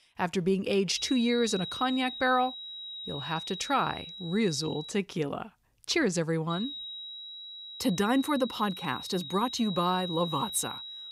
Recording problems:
high-pitched whine; loud; from 1 to 5 s and from 6.5 s on; 4 kHz, 9 dB below the speech

